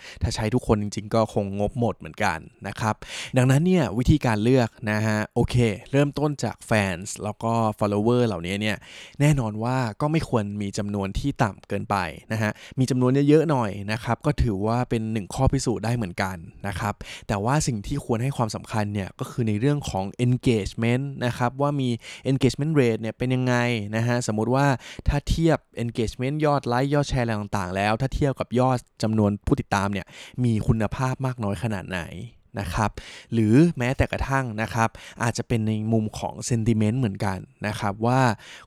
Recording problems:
uneven, jittery; strongly; from 4.5 to 33 s

